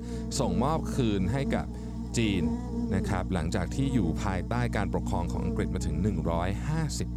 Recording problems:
electrical hum; loud; throughout; 60 Hz, 7 dB below the speech

